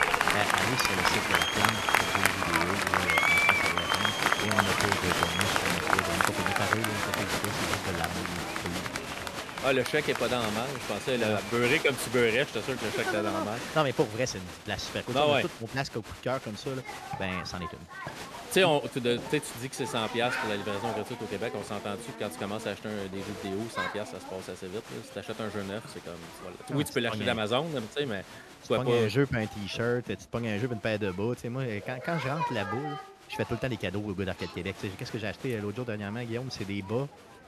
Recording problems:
crowd noise; very loud; throughout; 2 dB above the speech

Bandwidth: 13.5 kHz